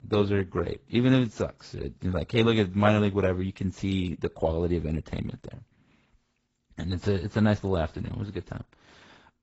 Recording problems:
garbled, watery; badly; nothing above 8 kHz

